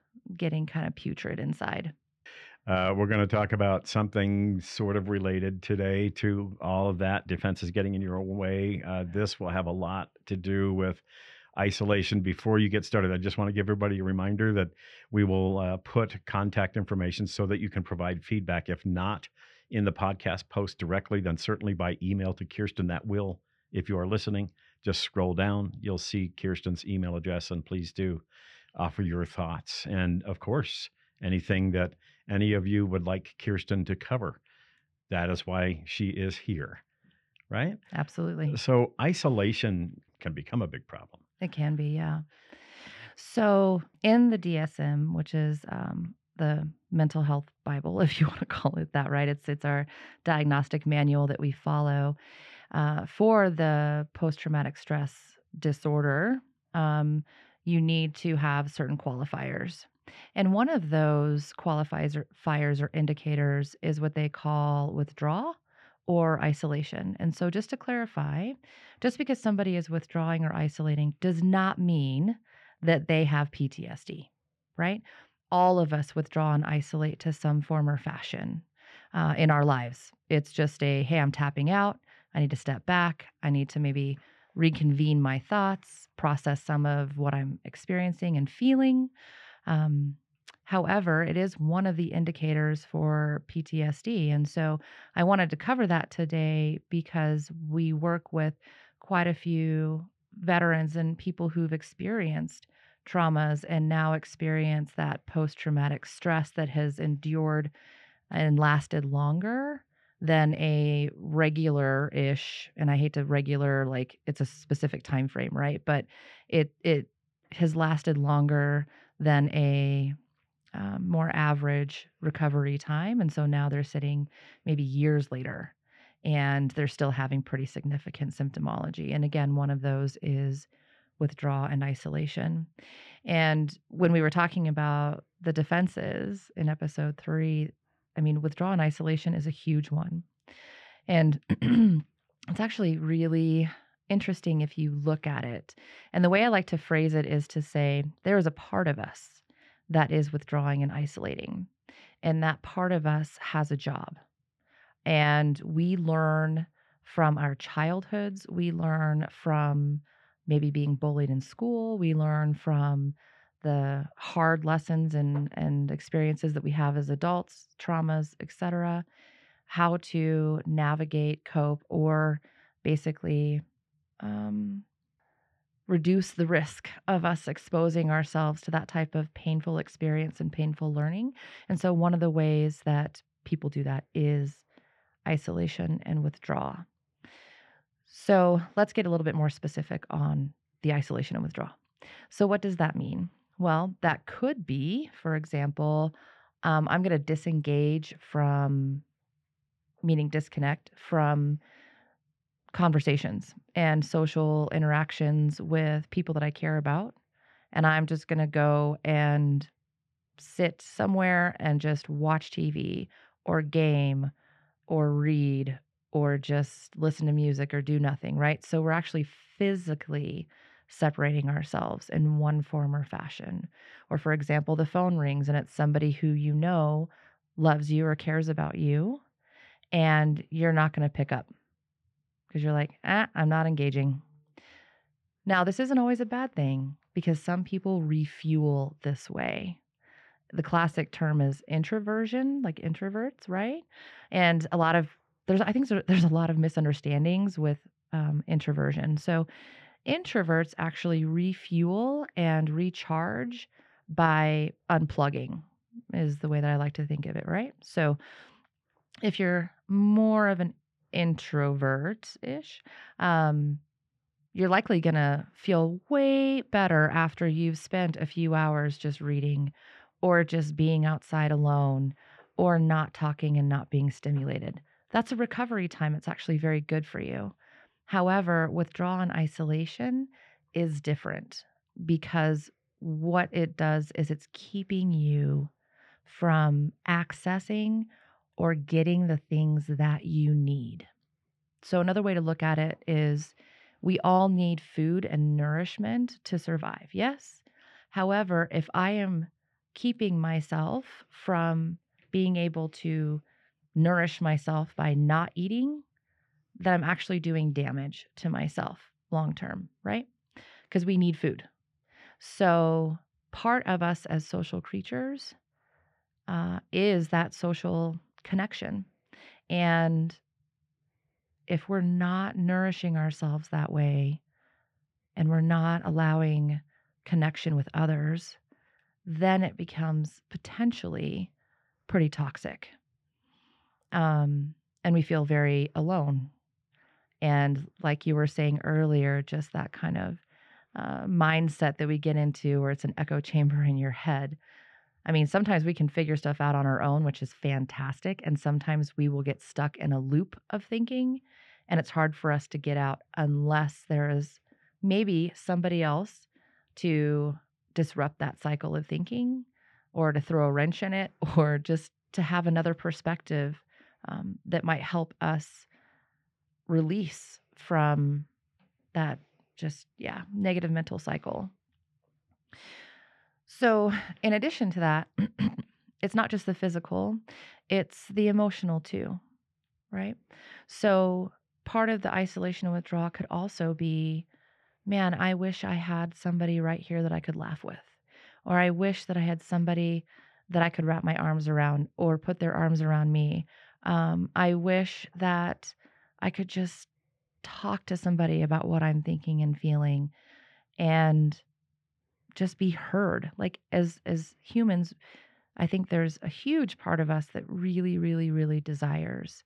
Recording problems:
muffled; slightly; fading above 2.5 kHz

